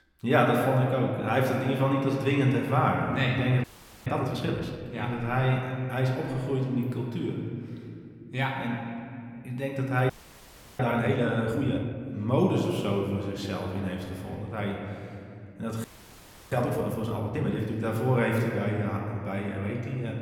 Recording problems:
room echo; noticeable; dies away in 2.2 s
off-mic speech; somewhat distant
audio freezing; at 3.5 s, at 10 s for 0.5 s and at 16 s for 0.5 s

